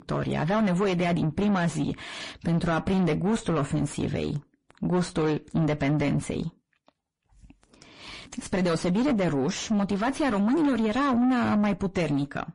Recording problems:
distortion; heavy; 5 dB below the speech
garbled, watery; slightly; nothing above 10.5 kHz

